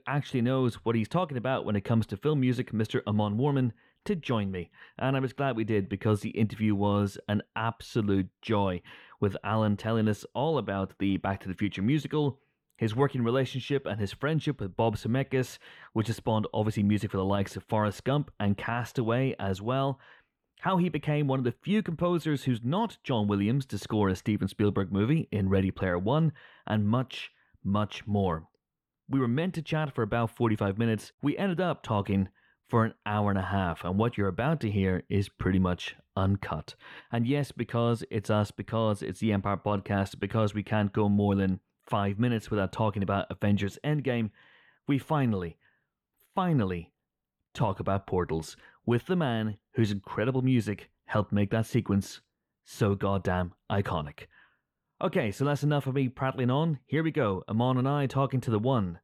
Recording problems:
muffled; very; fading above 3 kHz

